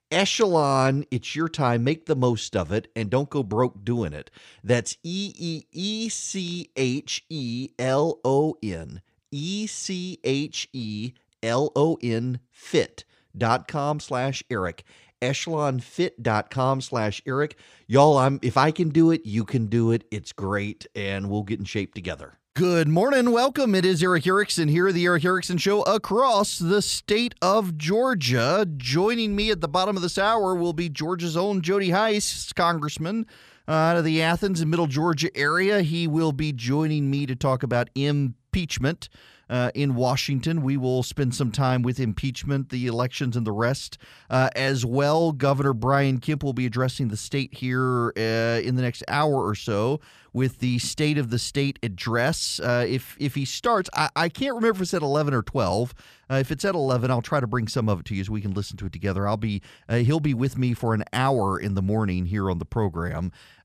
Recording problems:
none

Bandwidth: 14.5 kHz